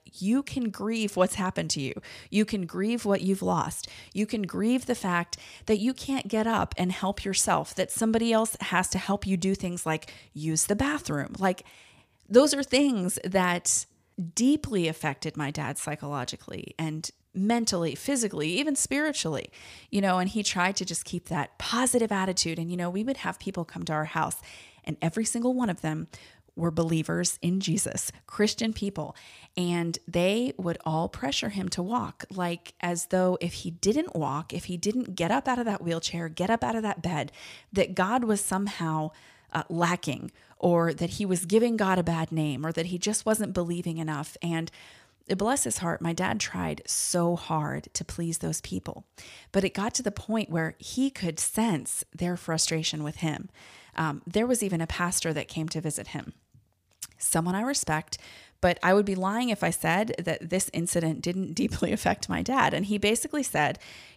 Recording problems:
none

